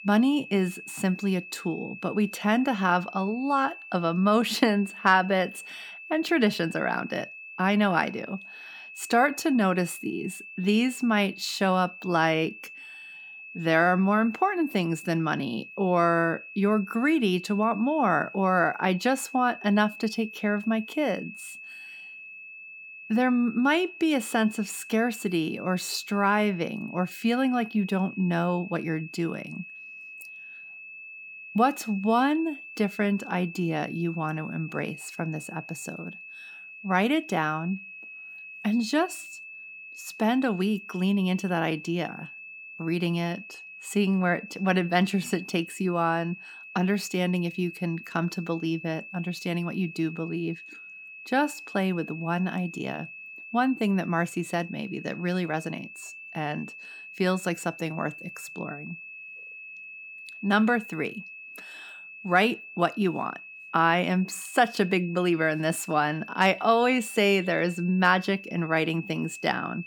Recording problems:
high-pitched whine; noticeable; throughout; 2.5 kHz, 15 dB below the speech

